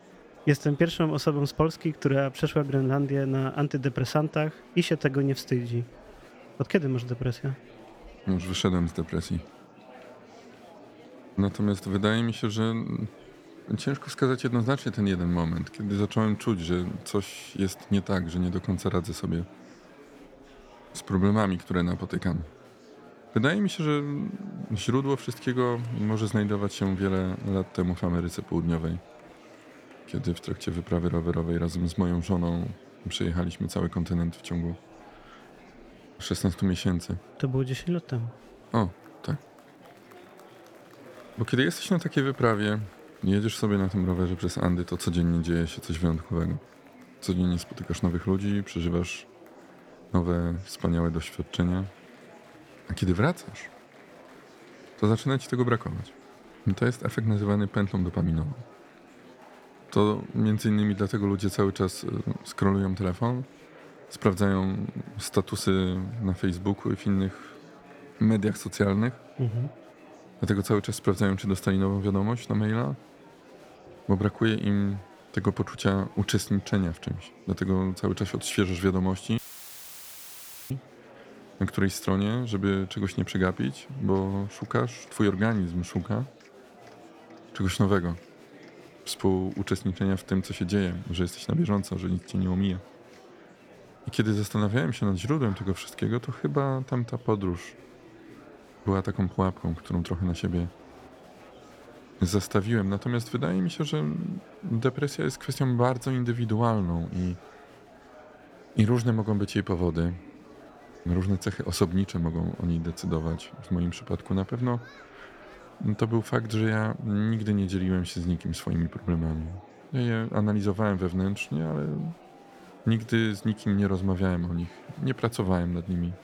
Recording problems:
murmuring crowd; faint; throughout; 20 dB below the speech
audio cutting out; filled with static; at 1:19 for 1.5 s

